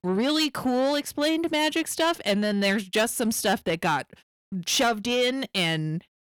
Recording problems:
distortion; slight; 10 dB below the speech

